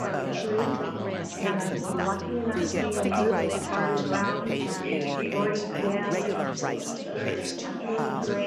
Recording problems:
chatter from many people; very loud; throughout; 4 dB above the speech
household noises; noticeable; until 4 s; 15 dB below the speech

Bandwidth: 14.5 kHz